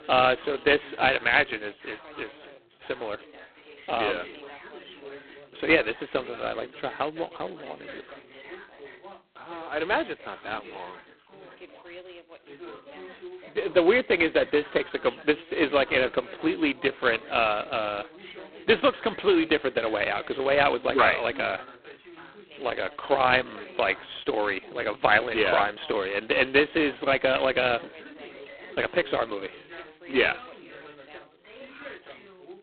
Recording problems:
phone-call audio; poor line; nothing above 4 kHz
background chatter; noticeable; throughout; 3 voices, 20 dB below the speech

